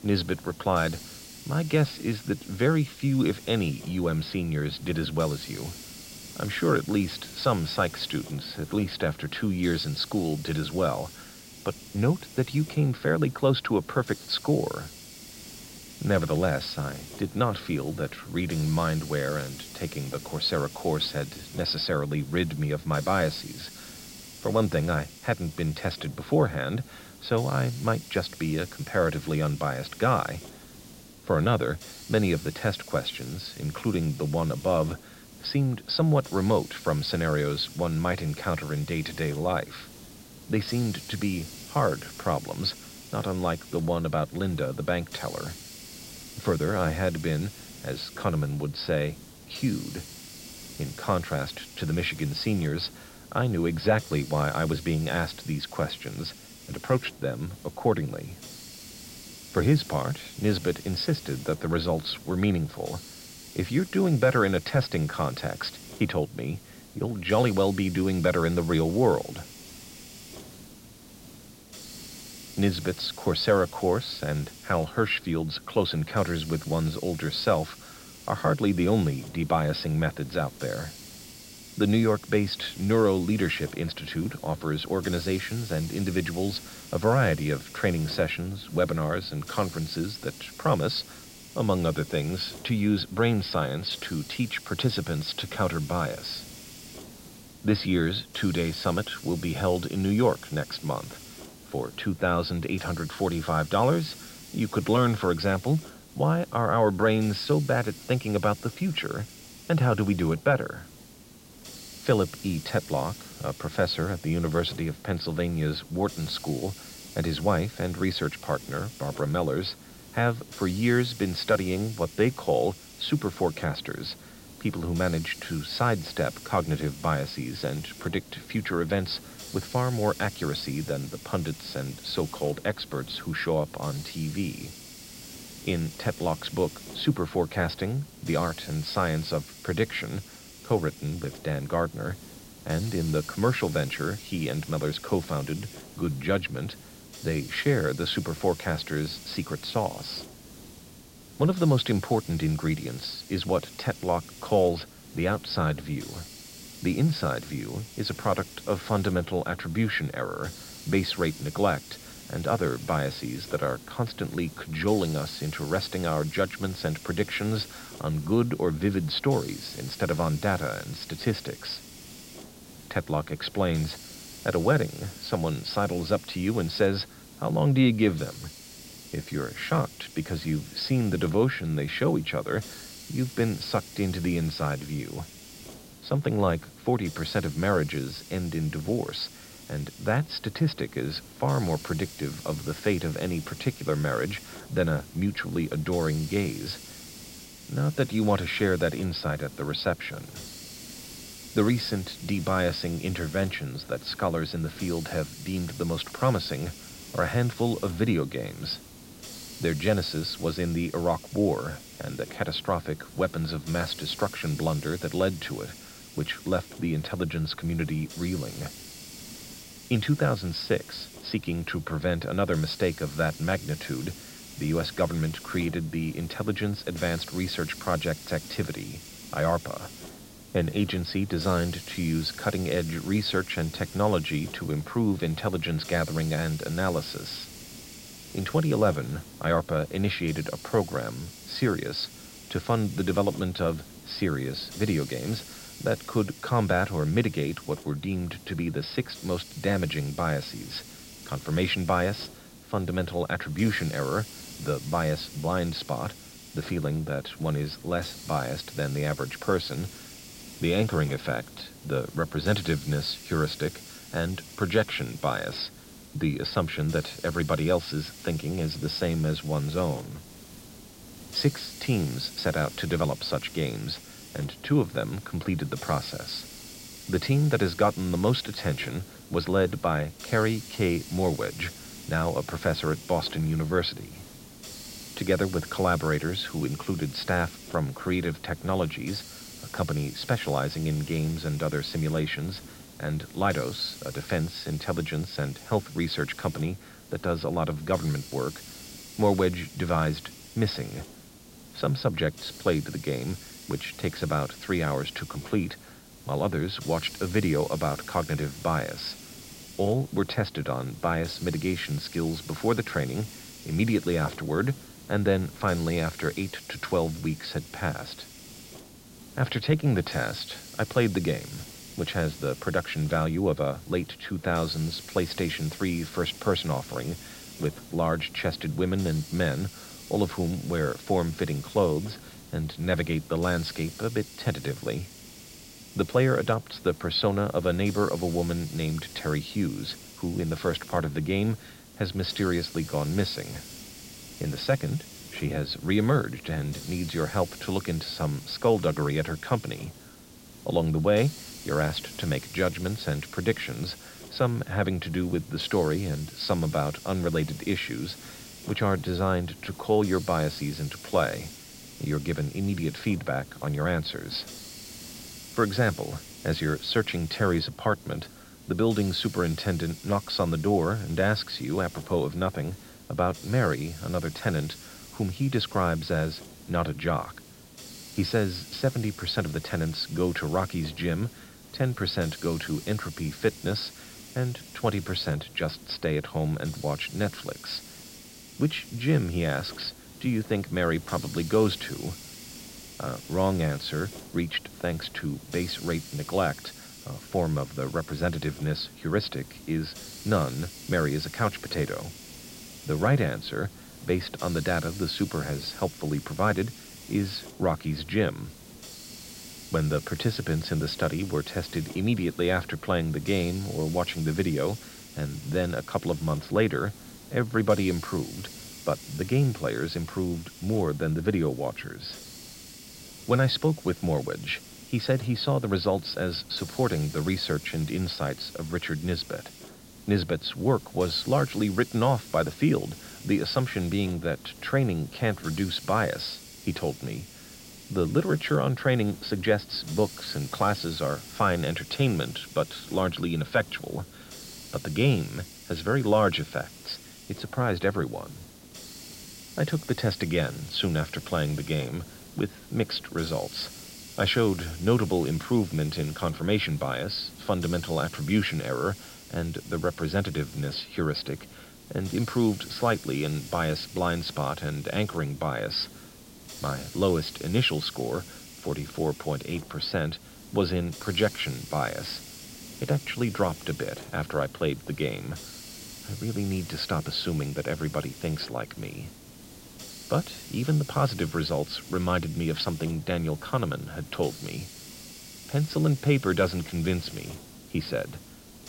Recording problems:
high frequencies cut off; noticeable; nothing above 5 kHz
hiss; noticeable; throughout; 15 dB below the speech

